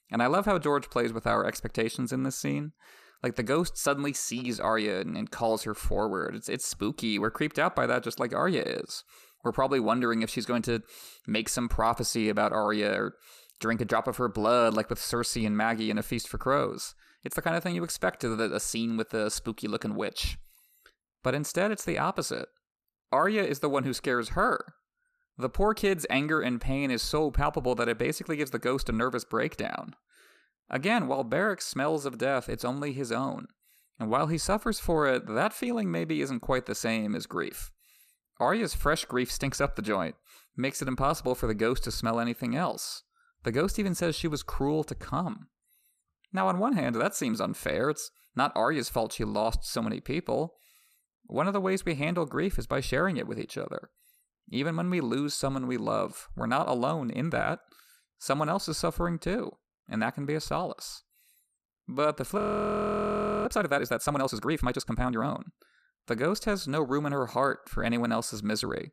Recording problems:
audio freezing; at 1:02 for 1 s

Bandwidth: 14.5 kHz